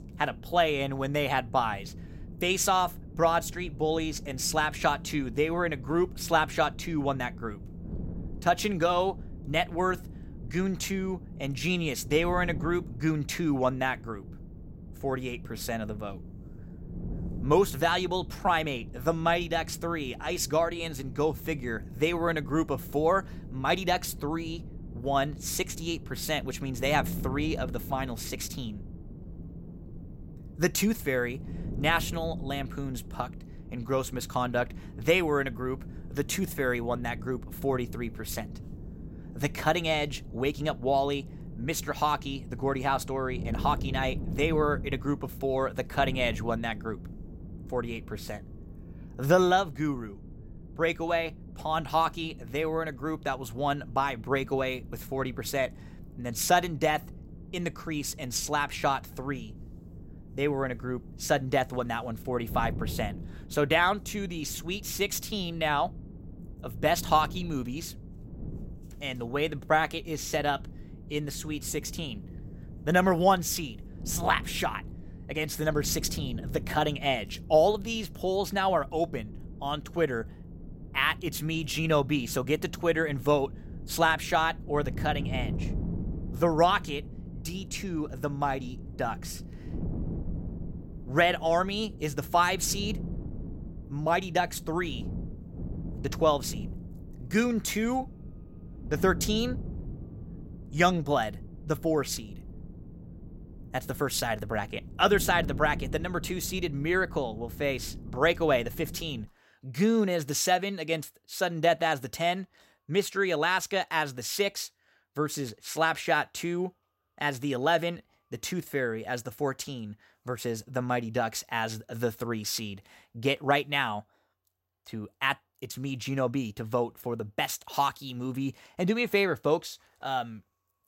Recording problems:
wind noise on the microphone; occasional gusts; until 1:49; 20 dB below the speech

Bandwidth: 16 kHz